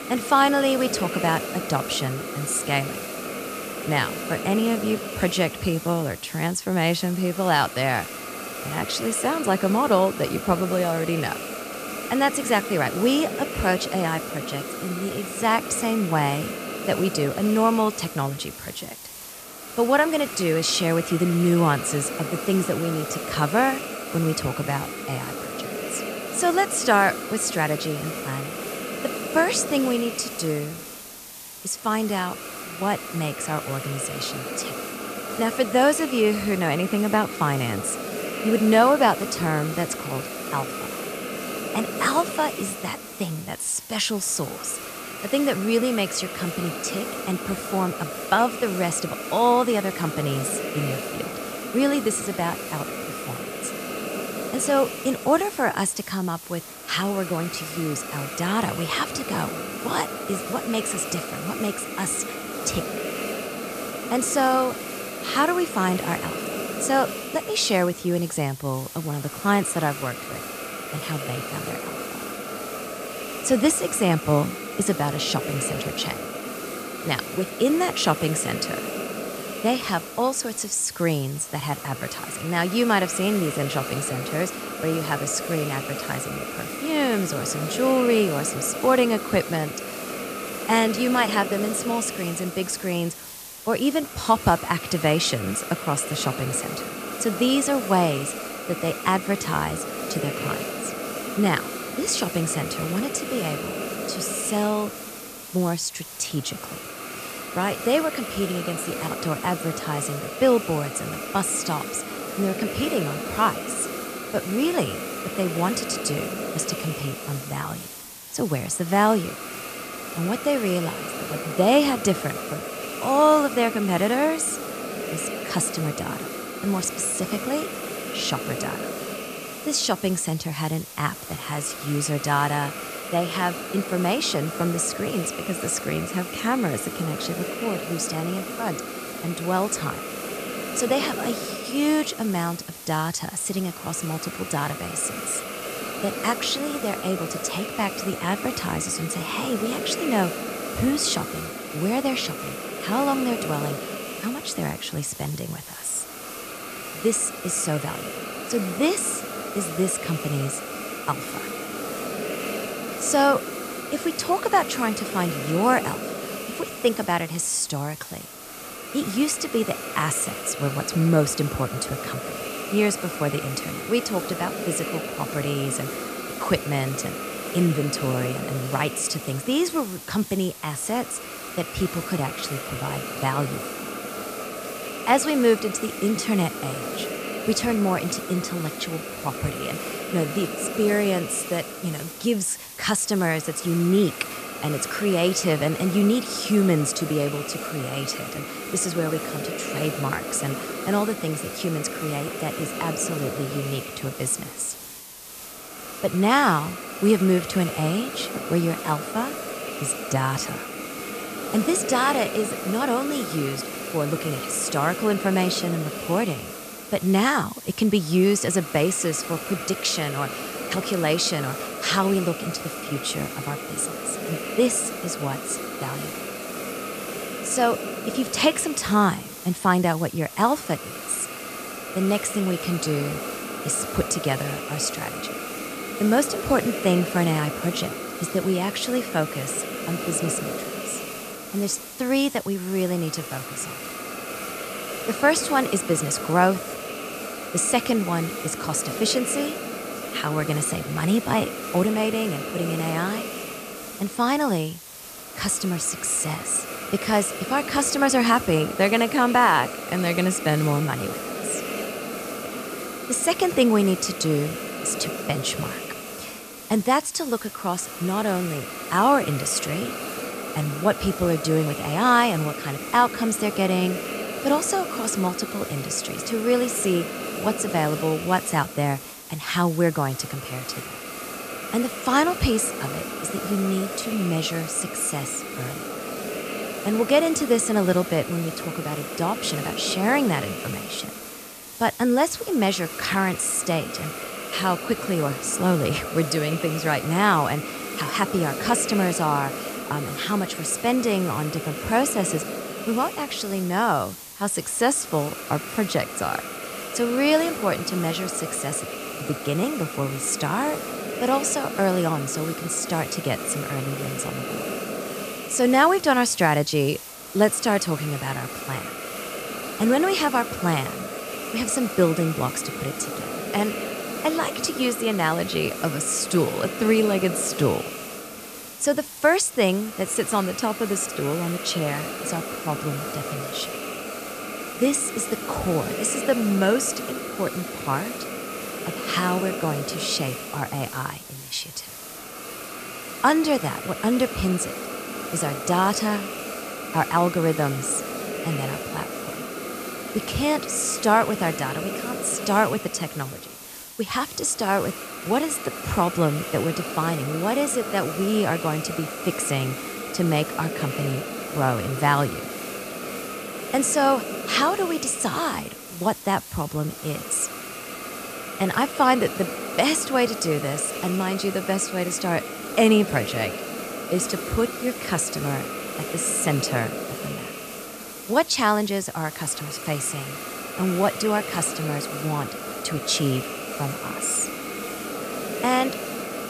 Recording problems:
hiss; loud; throughout; 7 dB below the speech

